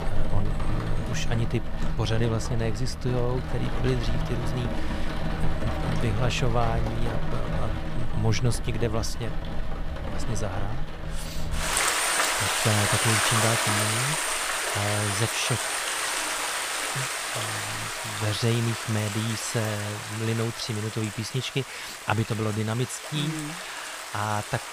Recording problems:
rain or running water; very loud; throughout; 1 dB above the speech

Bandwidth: 15 kHz